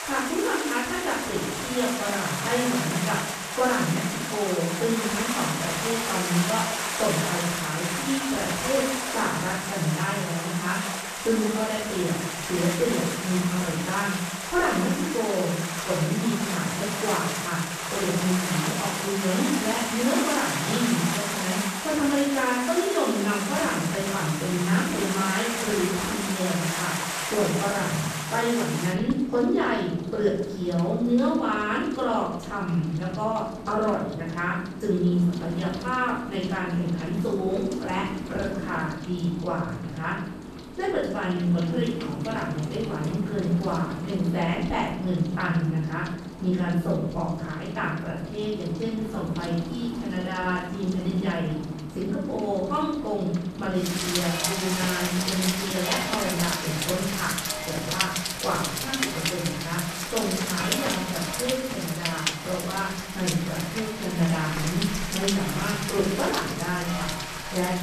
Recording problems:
off-mic speech; far
room echo; noticeable; dies away in 0.7 s
rain or running water; loud; throughout; 3 dB below the speech

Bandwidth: 14.5 kHz